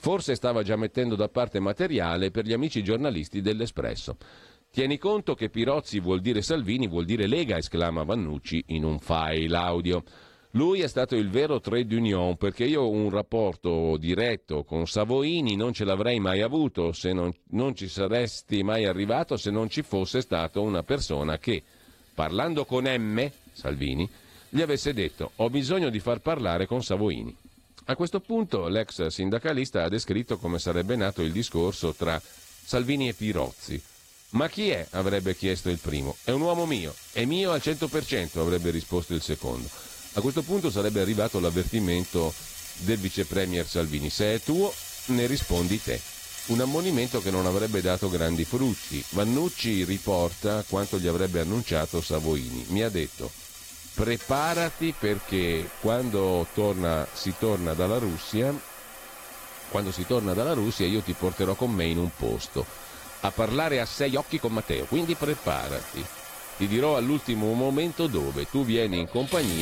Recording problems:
garbled, watery; slightly
household noises; noticeable; throughout; 10 dB below the speech
uneven, jittery; strongly; from 17 s to 1:06
abrupt cut into speech; at the end

